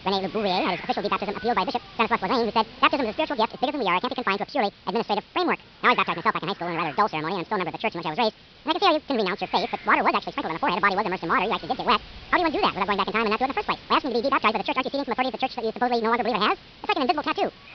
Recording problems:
wrong speed and pitch; too fast and too high; 1.7 times normal speed
high frequencies cut off; noticeable; nothing above 5.5 kHz
hiss; noticeable; throughout; 20 dB below the speech

